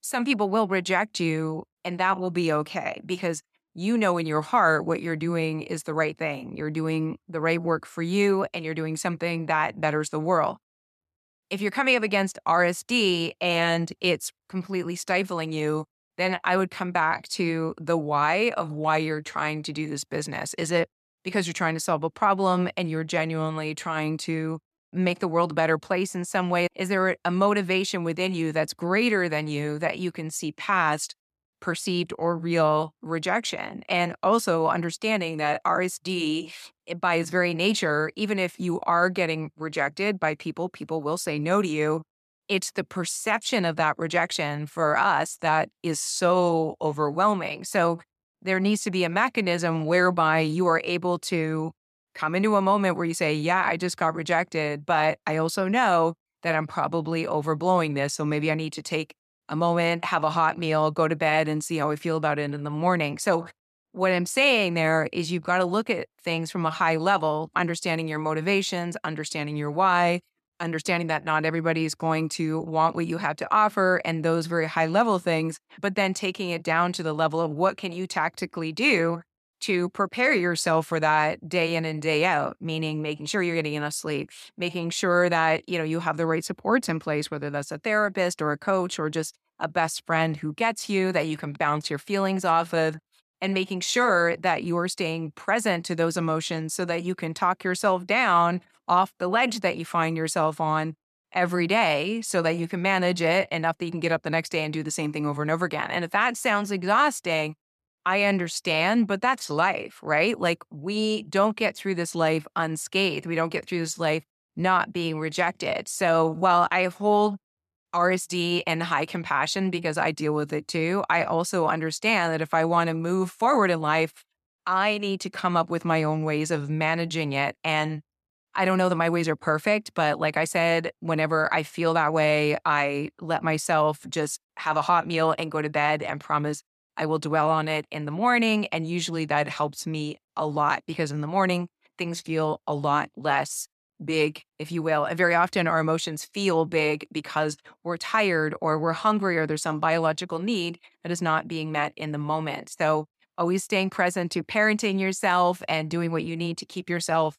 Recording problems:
none

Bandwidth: 14 kHz